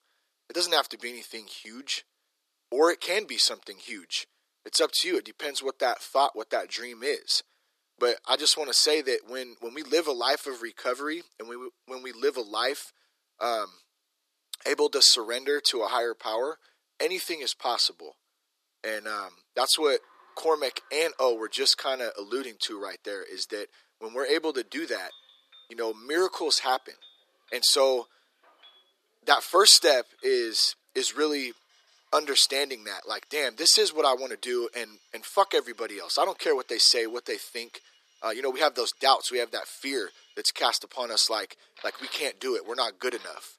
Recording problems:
thin; somewhat; fading below 350 Hz
household noises; faint; from 20 s on; 30 dB below the speech

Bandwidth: 14.5 kHz